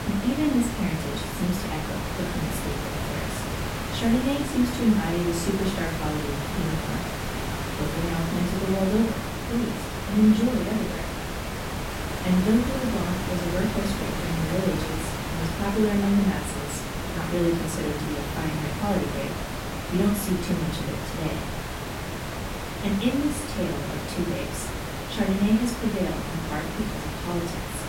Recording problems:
off-mic speech; far
echo of what is said; faint; from 8.5 s on; 440 ms later, 25 dB below the speech
room echo; slight; dies away in 0.4 s
hiss; loud; throughout; 4 dB below the speech

